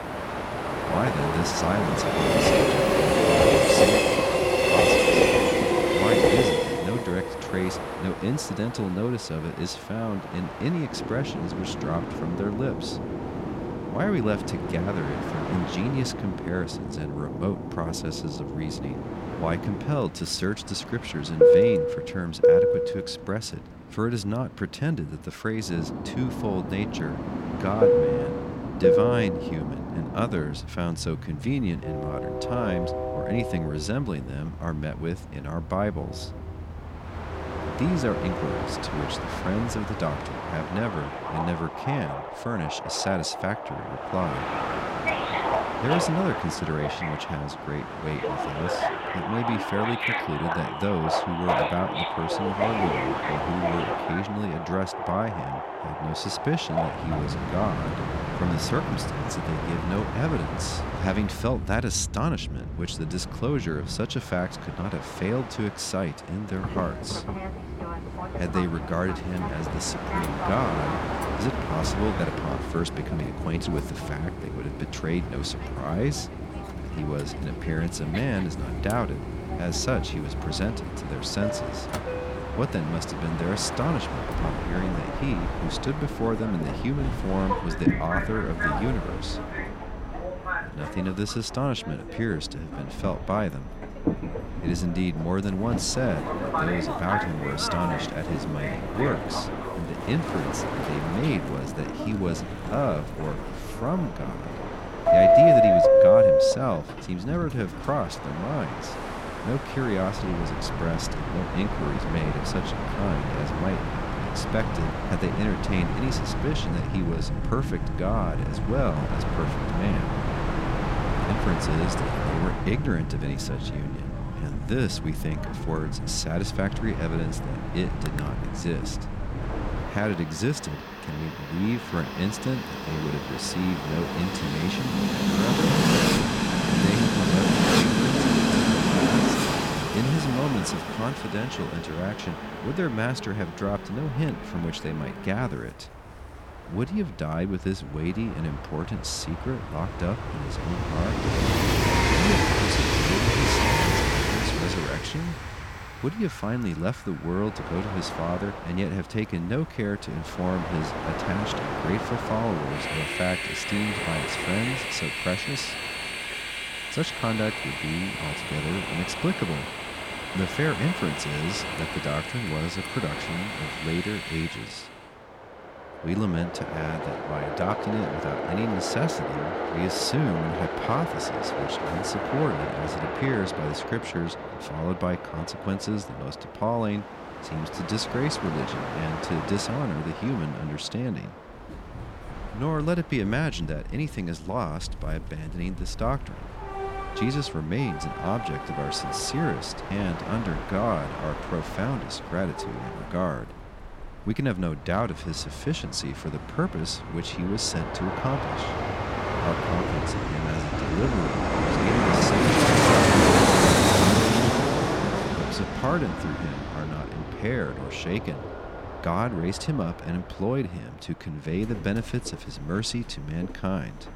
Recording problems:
train or aircraft noise; very loud; throughout; 3 dB above the speech

